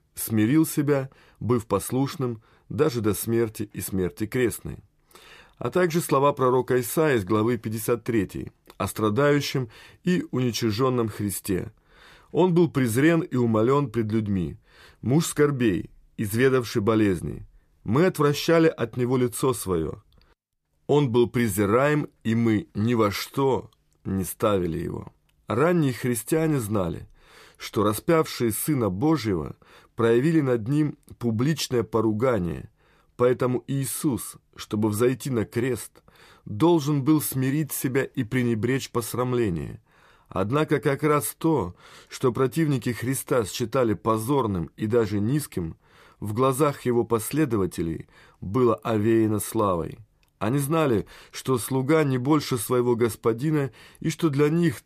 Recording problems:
none

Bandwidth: 14.5 kHz